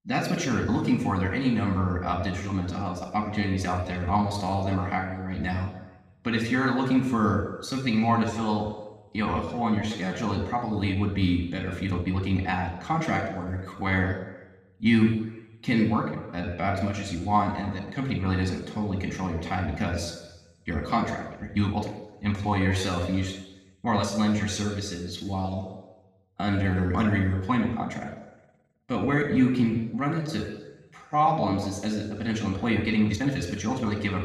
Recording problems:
room echo; noticeable; dies away in 1 s
off-mic speech; somewhat distant
uneven, jittery; strongly; from 2.5 to 33 s

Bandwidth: 15.5 kHz